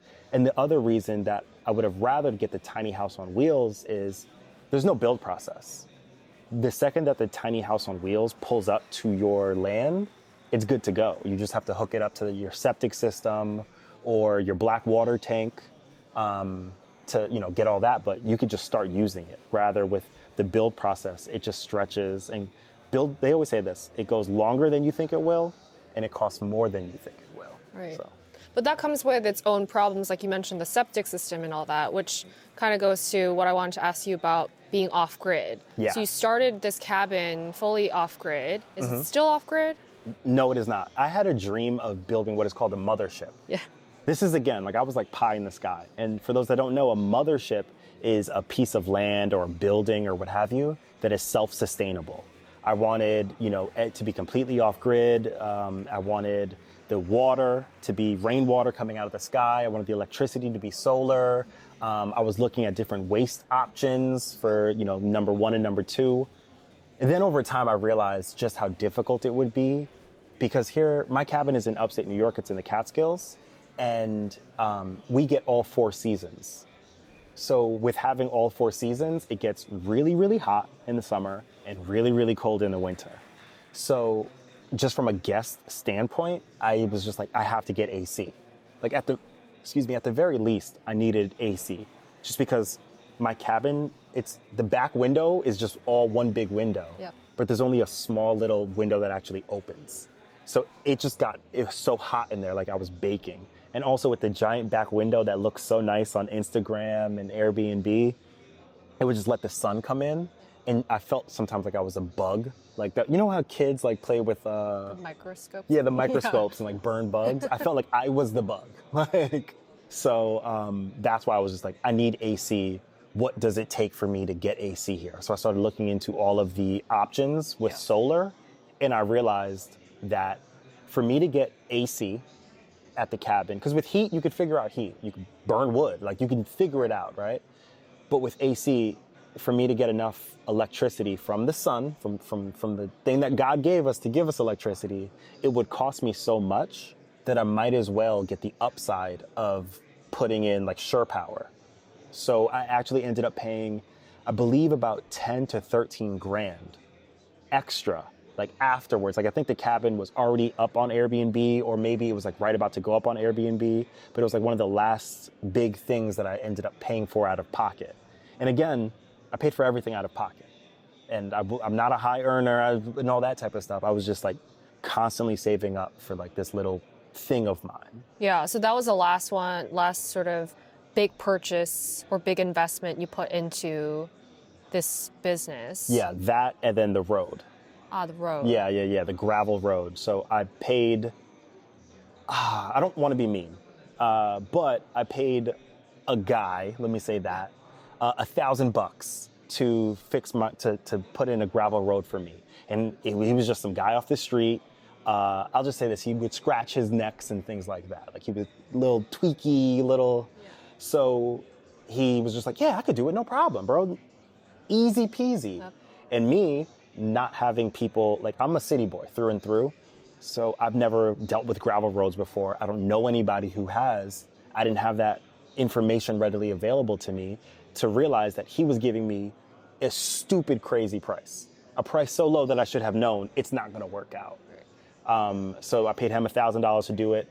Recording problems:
murmuring crowd; faint; throughout; 30 dB below the speech

